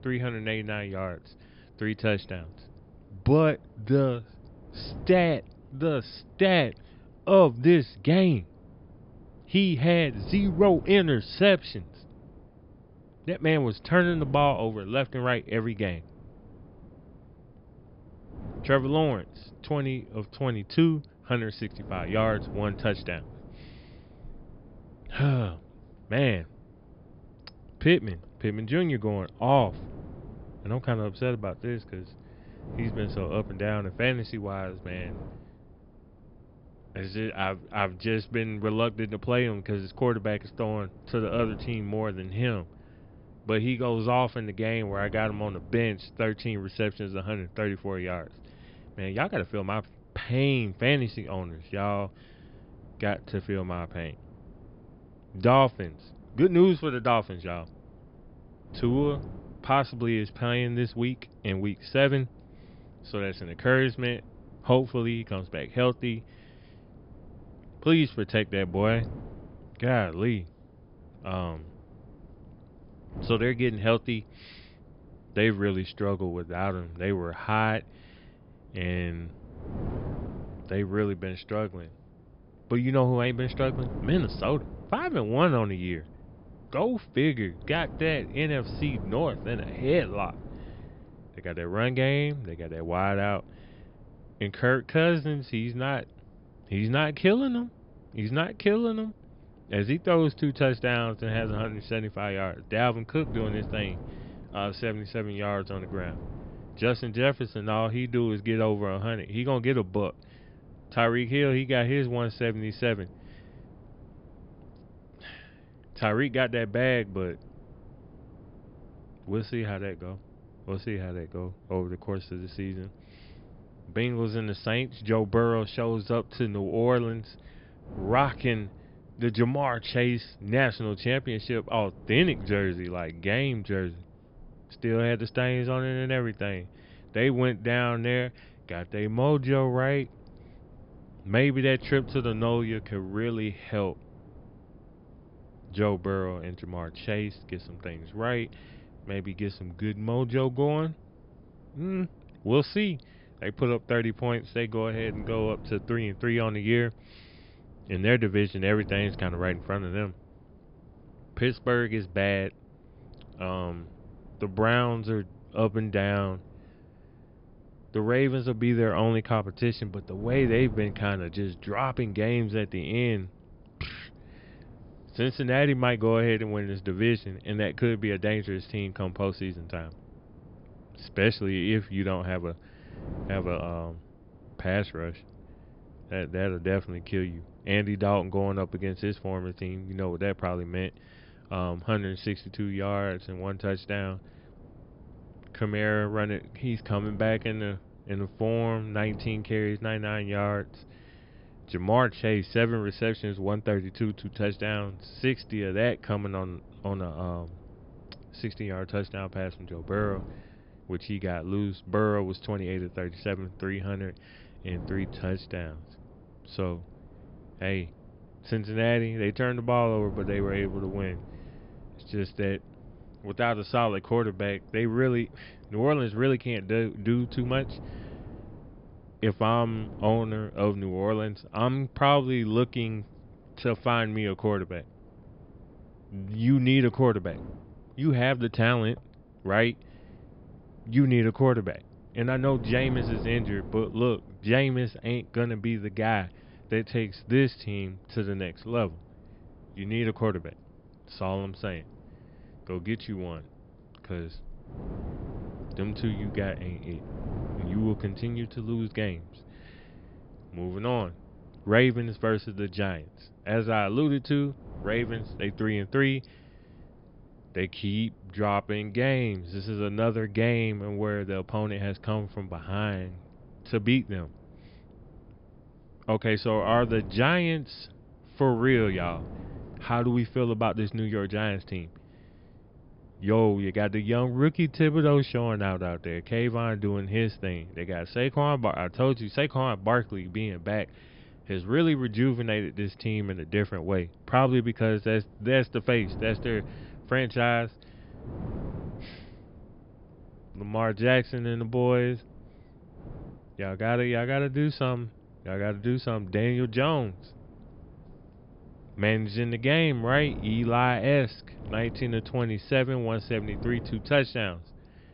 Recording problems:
high frequencies cut off; noticeable; nothing above 5 kHz
wind noise on the microphone; occasional gusts; 25 dB below the speech

